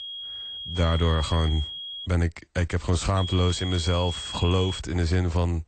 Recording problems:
garbled, watery; slightly; nothing above 8.5 kHz
high-pitched whine; loud; until 2 s and from 3 to 5 s; 3.5 kHz, 8 dB below the speech

